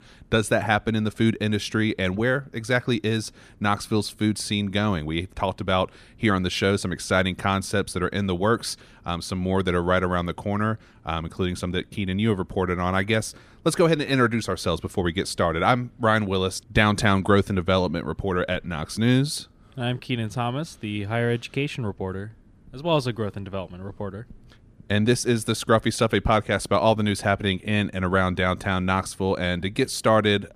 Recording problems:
none

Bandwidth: 14.5 kHz